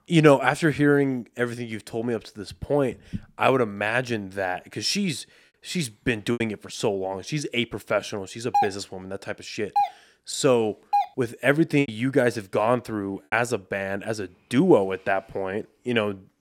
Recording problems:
choppy; very; at 5.5 s and from 12 to 13 s; 7% of the speech affected
doorbell; noticeable; from 8.5 to 11 s; peak level with the speech

